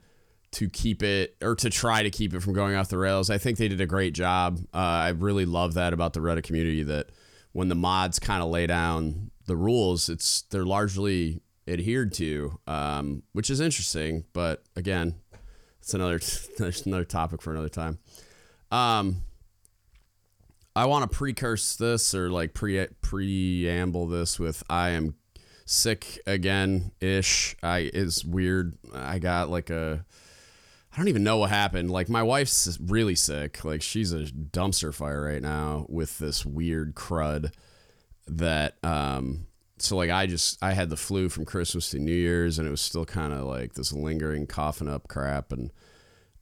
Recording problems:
none

